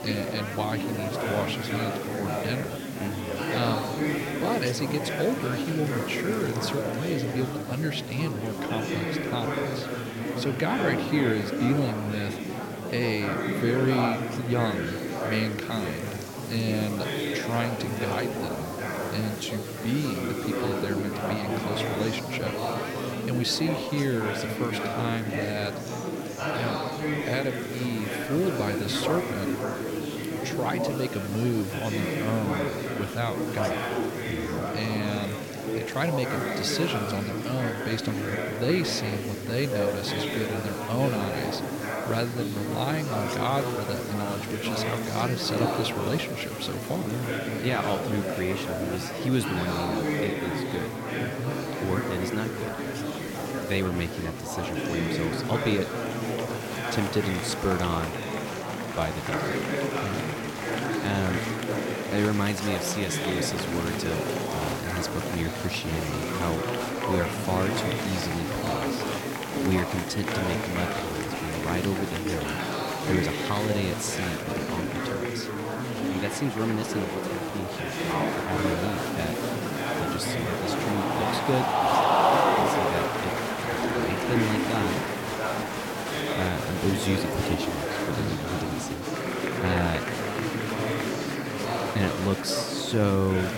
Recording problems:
murmuring crowd; very loud; throughout; 1 dB above the speech
hiss; noticeable; throughout; 15 dB below the speech

